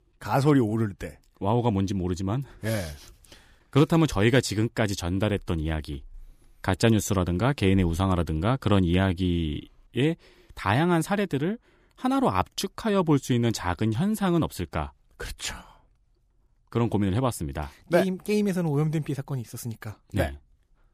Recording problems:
none

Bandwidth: 15 kHz